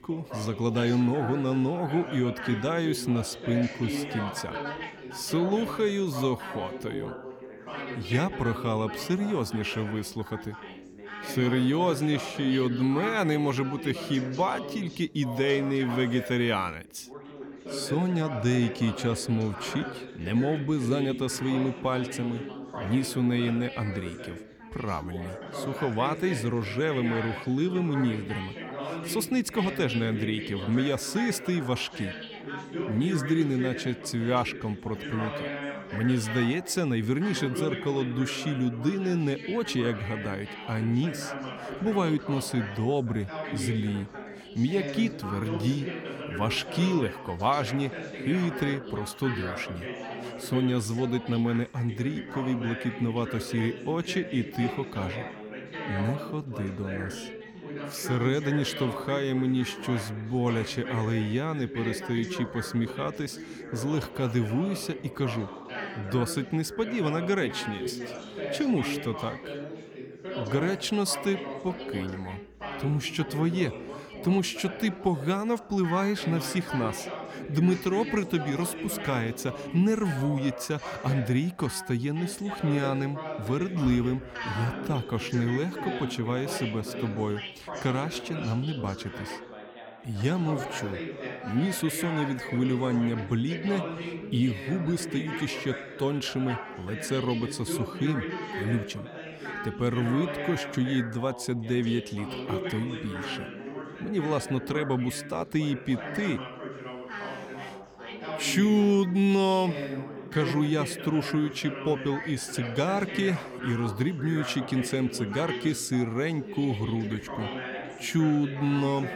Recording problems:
background chatter; loud; throughout; 3 voices, 8 dB below the speech

